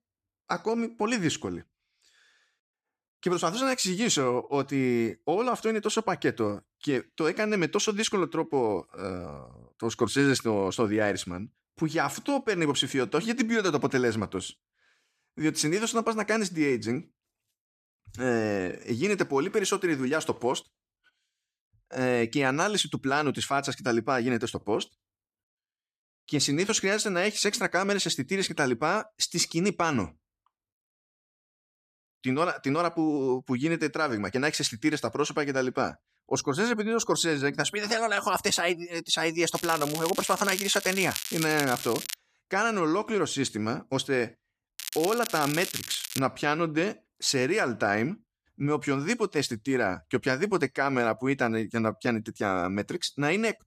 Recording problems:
crackling; loud; from 40 to 42 s and from 45 to 46 s; 7 dB below the speech

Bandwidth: 14.5 kHz